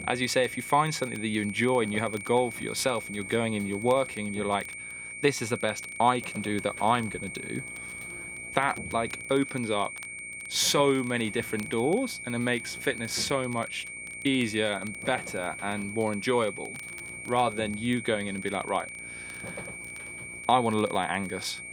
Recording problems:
high-pitched whine; loud; throughout; 2.5 kHz, 9 dB below the speech
electrical hum; faint; throughout; 60 Hz, 25 dB below the speech
crackle, like an old record; faint; 25 dB below the speech

